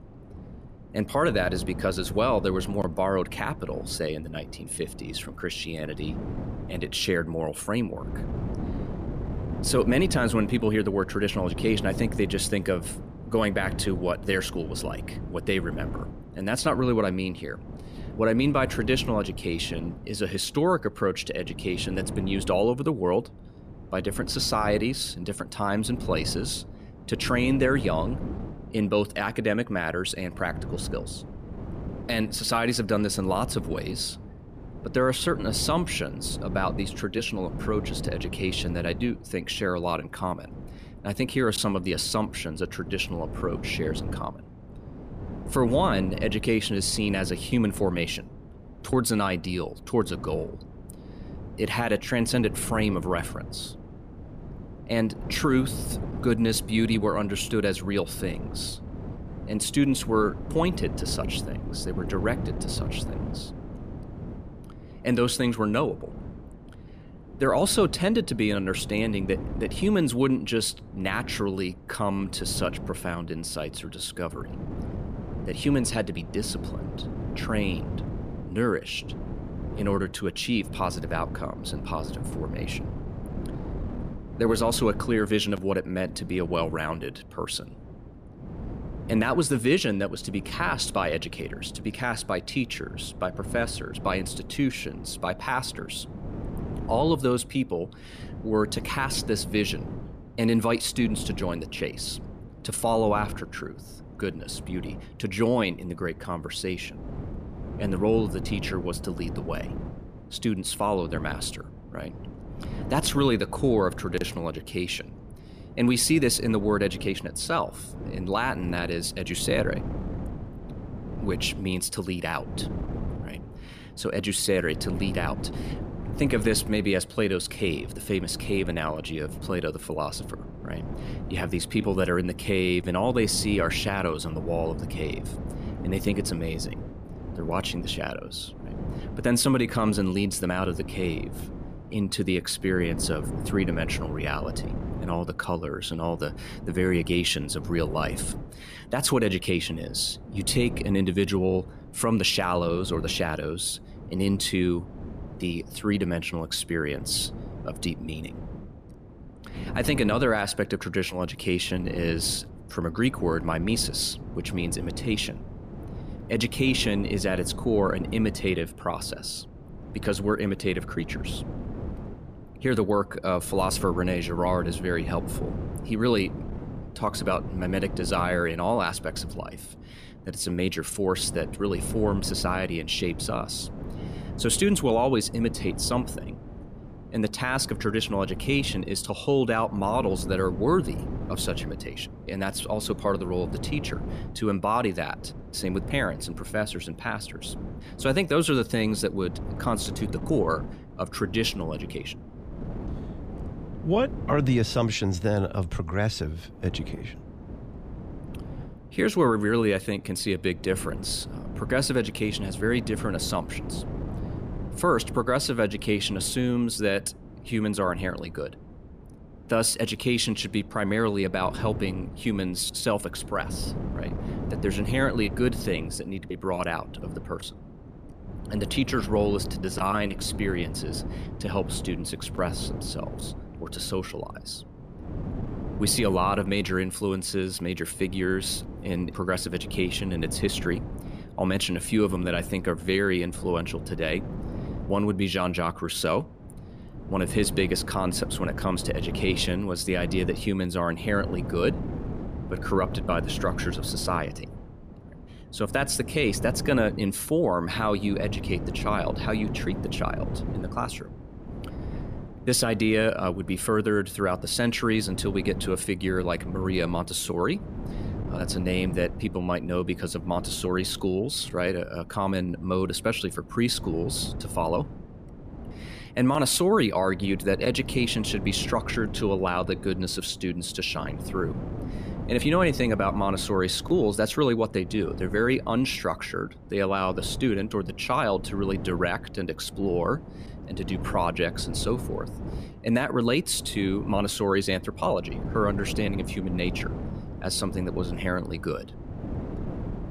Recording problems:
wind noise on the microphone; occasional gusts; 15 dB below the speech

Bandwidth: 14.5 kHz